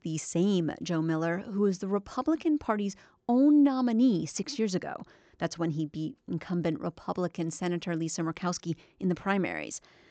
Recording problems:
high frequencies cut off; noticeable; nothing above 8 kHz

